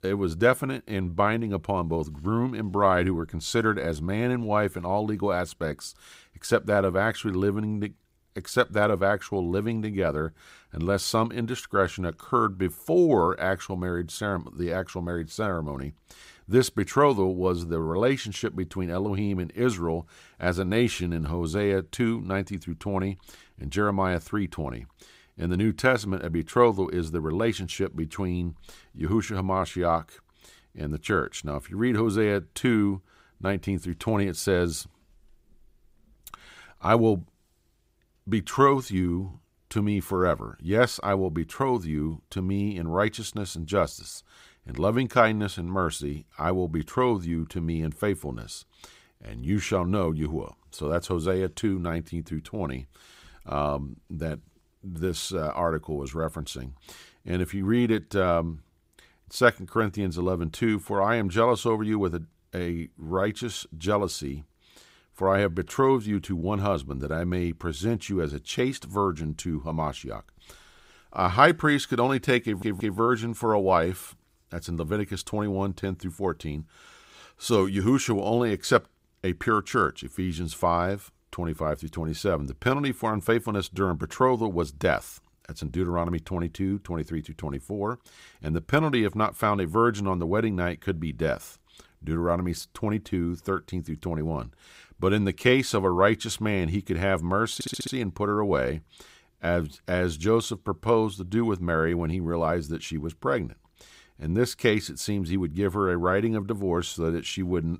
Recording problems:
audio stuttering; at 1:12 and at 1:38

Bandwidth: 15.5 kHz